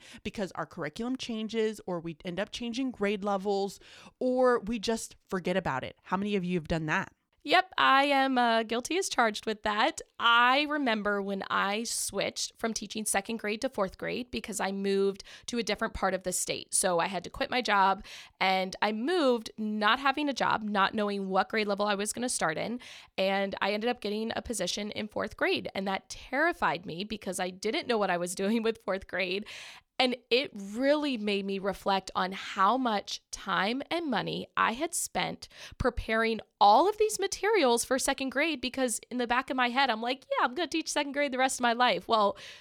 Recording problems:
none

